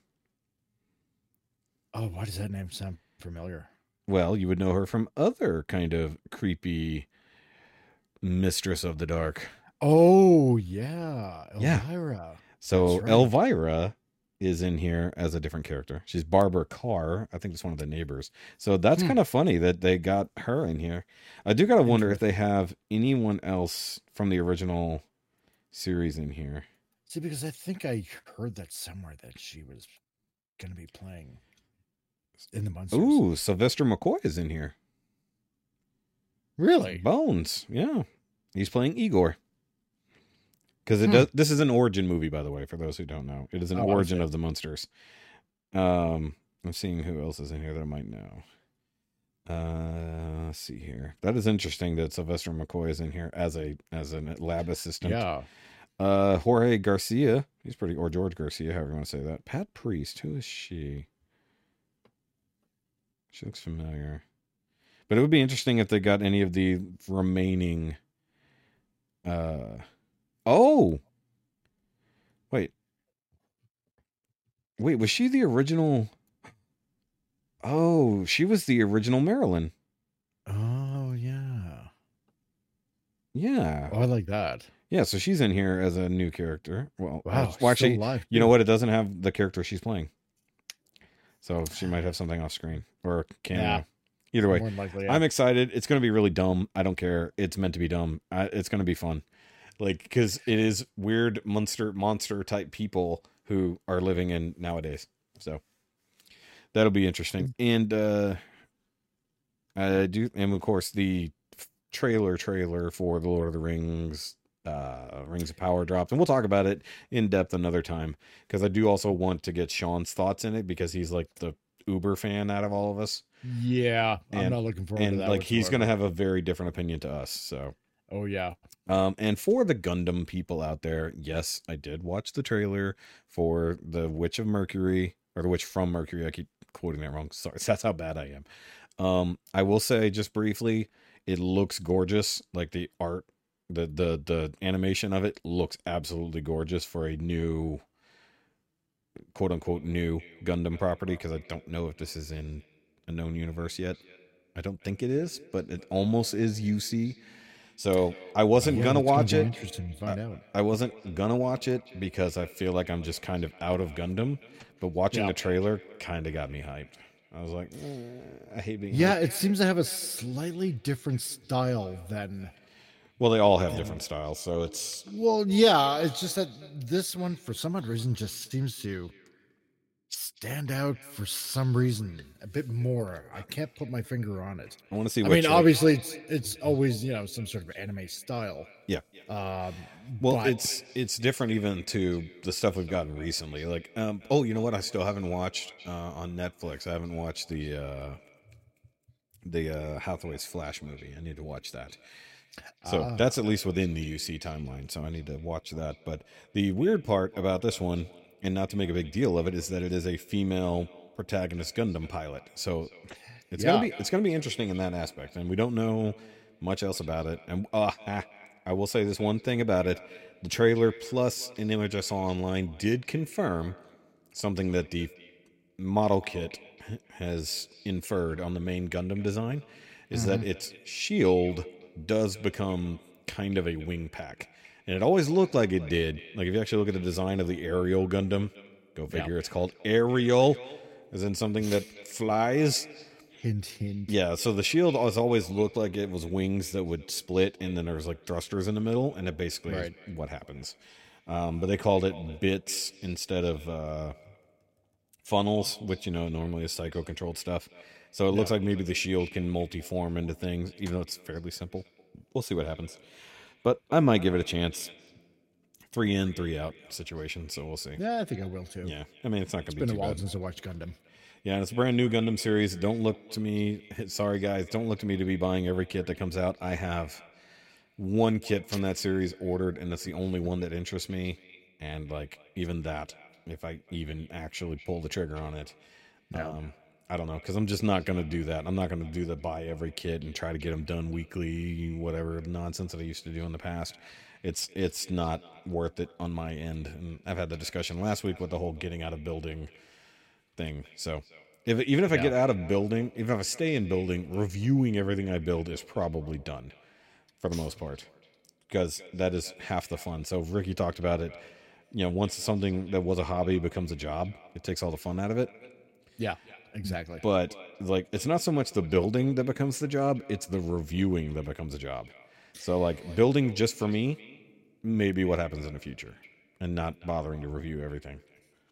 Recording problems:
echo of what is said; faint; from 2:29 on; 240 ms later, 20 dB below the speech

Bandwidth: 16 kHz